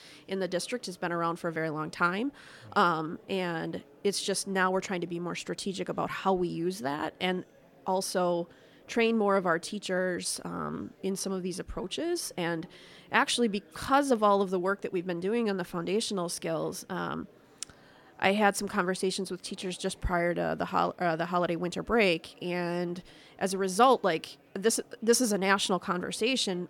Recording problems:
murmuring crowd; faint; throughout; 30 dB below the speech

